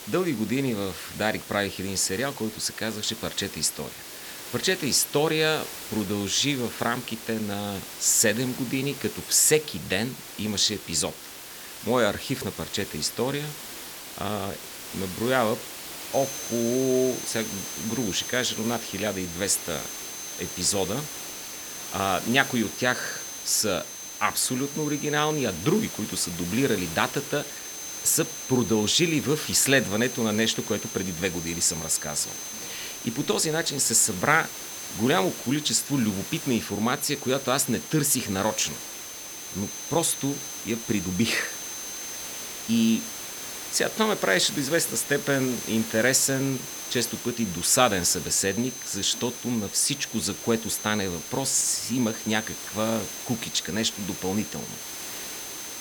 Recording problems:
high-pitched whine; noticeable; from 16 s on; 6.5 kHz, 10 dB below the speech
hiss; noticeable; throughout; 10 dB below the speech

